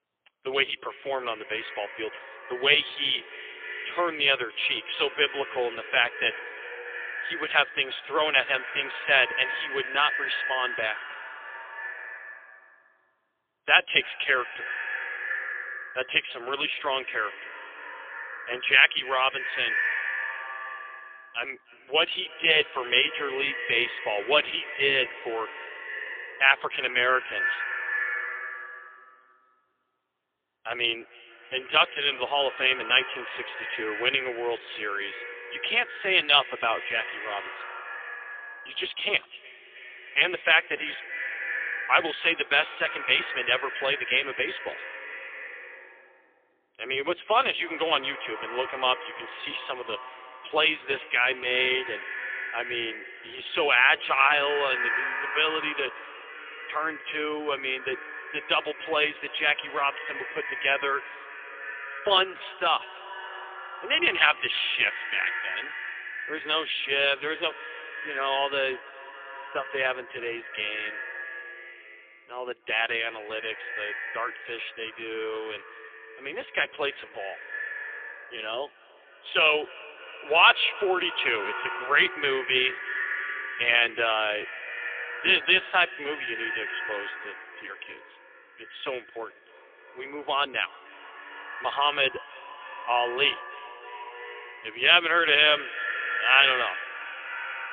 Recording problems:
phone-call audio; poor line; nothing above 3.5 kHz
echo of what is said; strong; throughout; 300 ms later, 10 dB below the speech
thin; very; fading below 350 Hz

